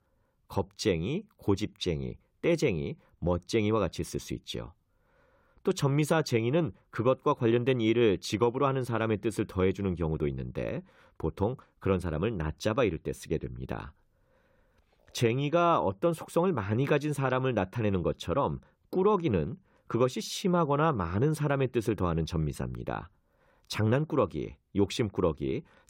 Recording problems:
none

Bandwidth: 16 kHz